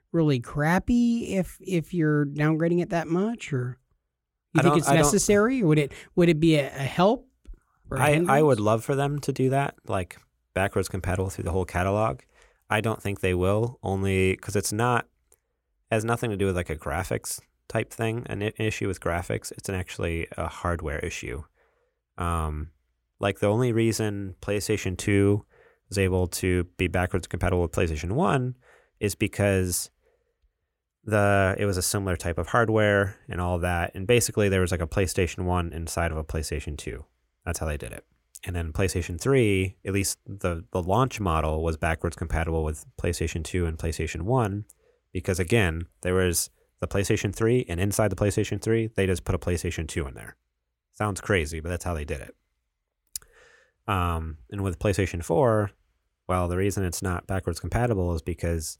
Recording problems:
none

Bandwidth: 16.5 kHz